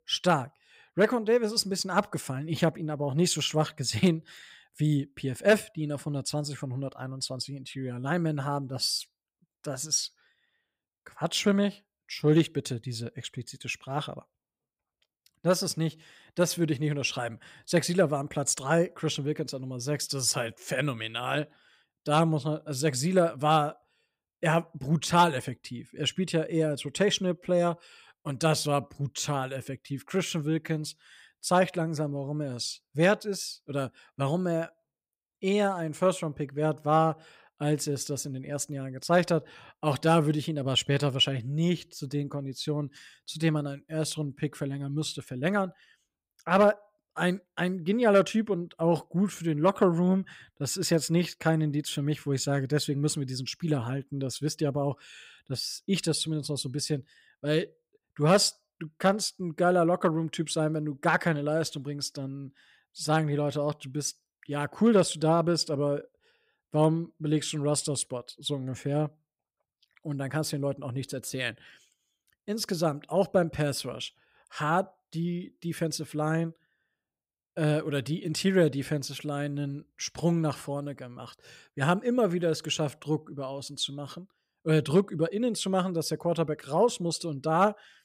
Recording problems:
none

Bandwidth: 15.5 kHz